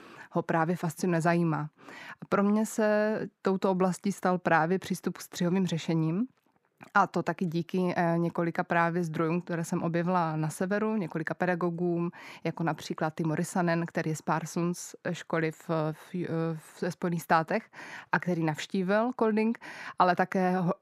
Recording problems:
muffled; slightly; fading above 3.5 kHz

